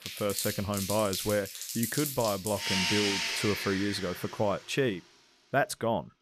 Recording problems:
household noises; loud; throughout; 1 dB below the speech

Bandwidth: 14.5 kHz